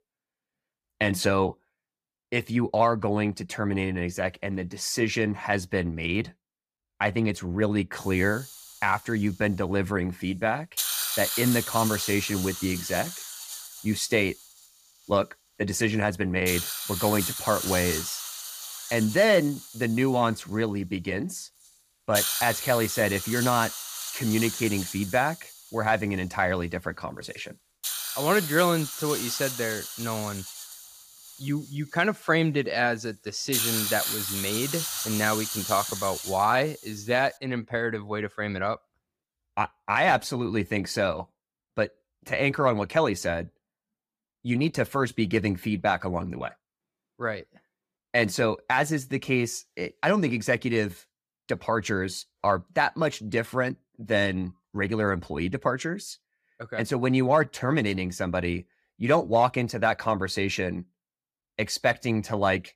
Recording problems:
hiss; loud; from 8 to 37 s; 4 dB below the speech

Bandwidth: 15 kHz